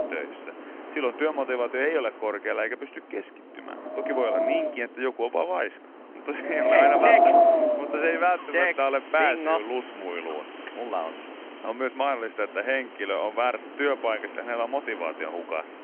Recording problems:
phone-call audio
wind in the background; very loud; throughout; 5 dB above the speech

